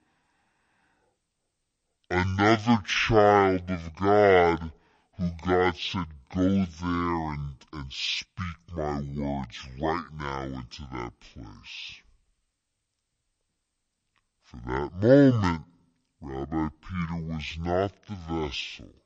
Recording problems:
wrong speed and pitch; too slow and too low; 0.5 times normal speed

